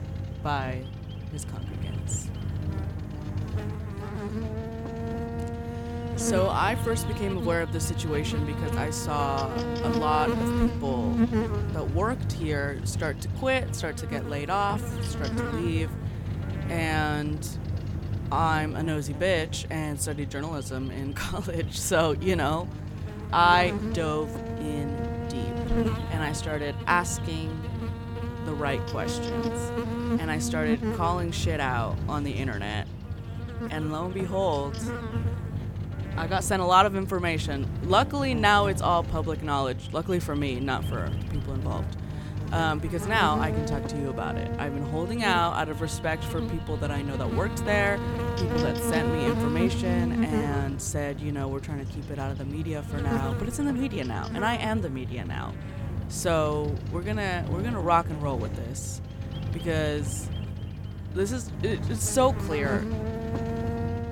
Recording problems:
electrical hum; loud; throughout; 50 Hz, 9 dB below the speech

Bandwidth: 17 kHz